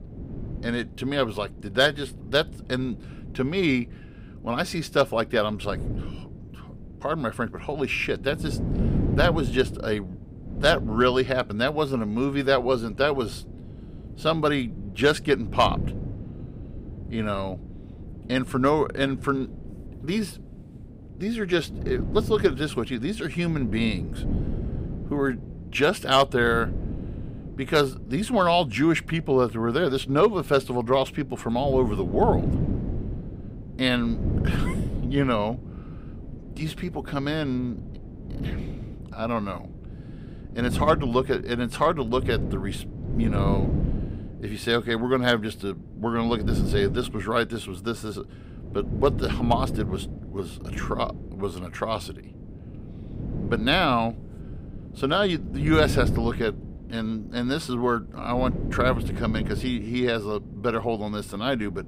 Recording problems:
wind noise on the microphone; occasional gusts; 15 dB below the speech

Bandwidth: 15.5 kHz